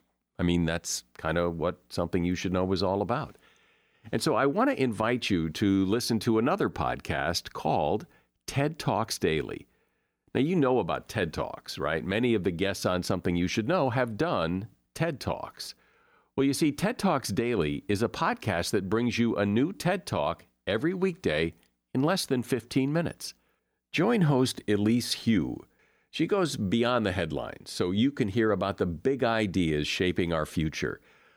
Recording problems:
none

